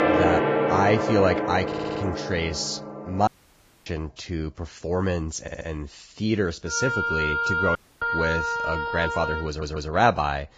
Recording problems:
garbled, watery; badly; nothing above 7.5 kHz
background music; very loud; throughout; 1 dB above the speech
audio stuttering; at 1.5 s, at 5.5 s and at 9.5 s
audio cutting out; at 3.5 s for 0.5 s and at 8 s

